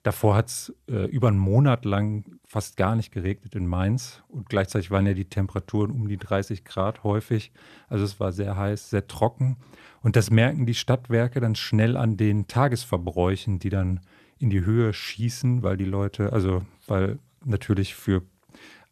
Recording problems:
none

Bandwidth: 13.5 kHz